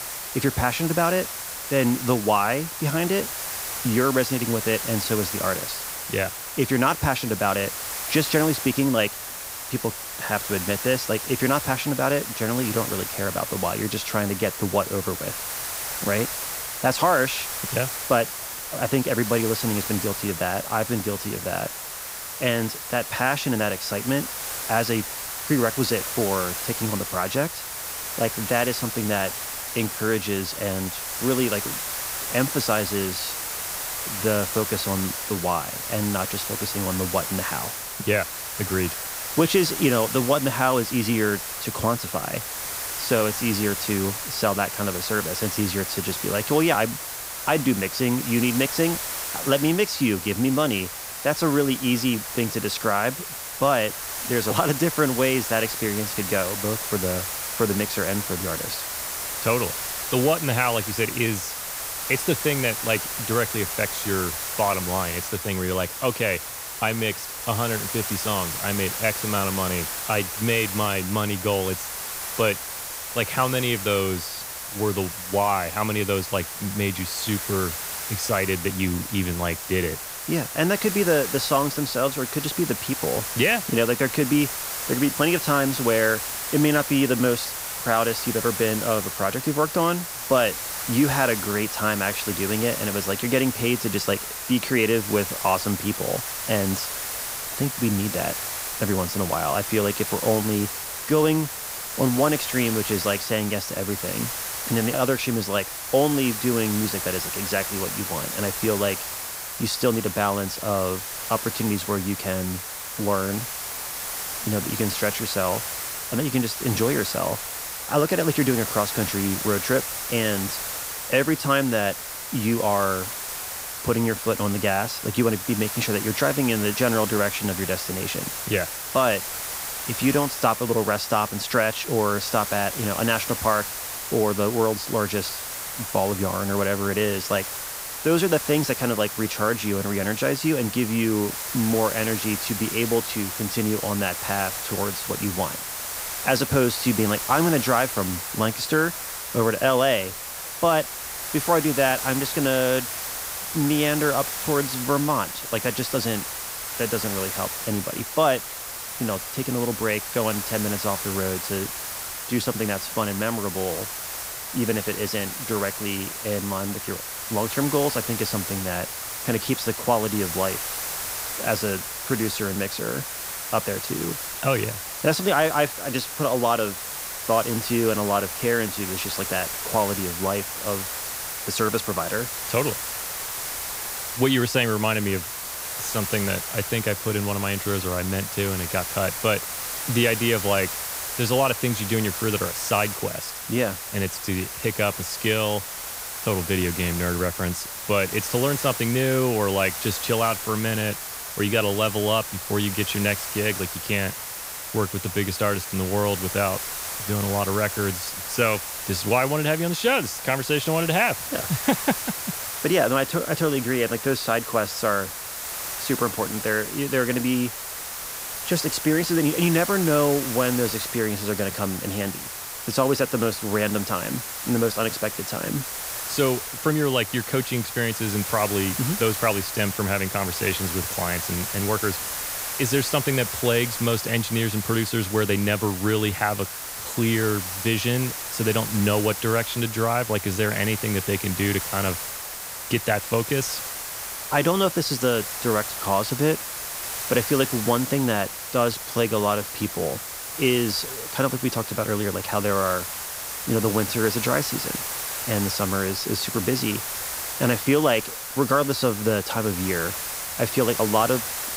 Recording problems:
hiss; loud; throughout; 4 dB below the speech

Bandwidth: 15.5 kHz